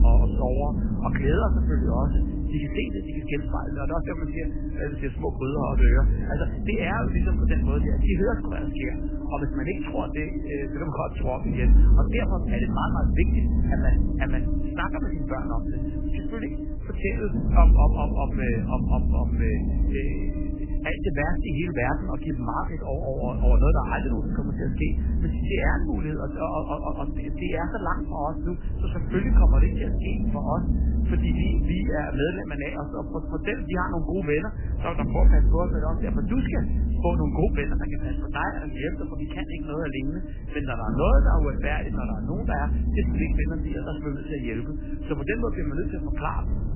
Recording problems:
garbled, watery; badly; nothing above 3 kHz
low rumble; loud; throughout; 7 dB below the speech

